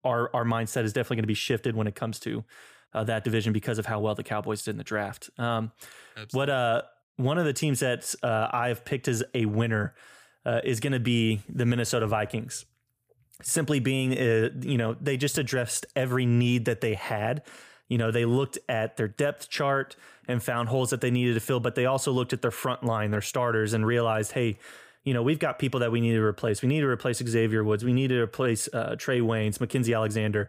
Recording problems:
none

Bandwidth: 15 kHz